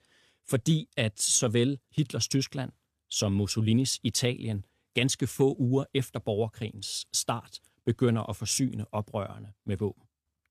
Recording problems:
none

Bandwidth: 14.5 kHz